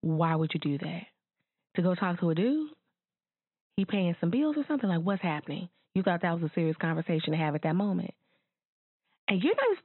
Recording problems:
high frequencies cut off; severe; nothing above 4 kHz

